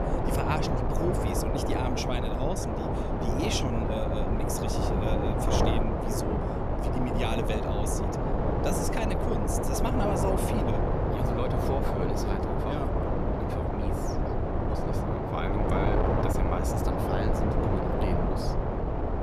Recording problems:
wind noise on the microphone; heavy; 5 dB above the speech

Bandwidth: 14.5 kHz